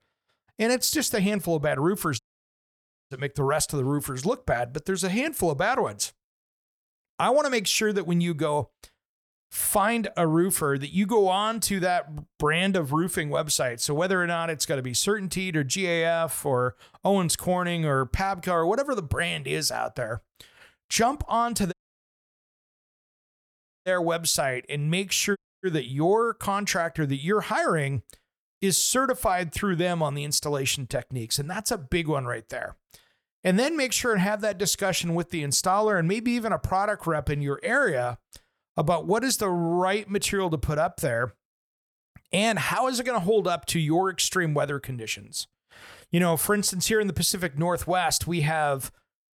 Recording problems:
audio cutting out; at 2 s for 1 s, at 22 s for 2 s and at 25 s

